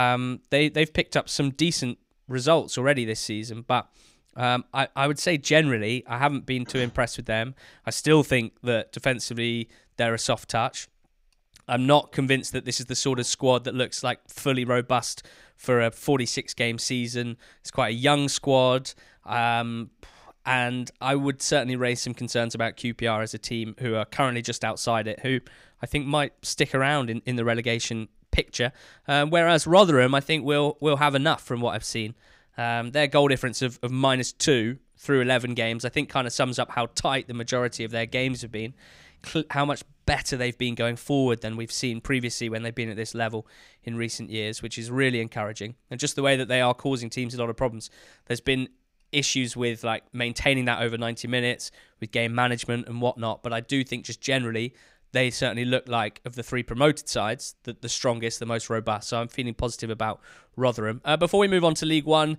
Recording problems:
abrupt cut into speech; at the start

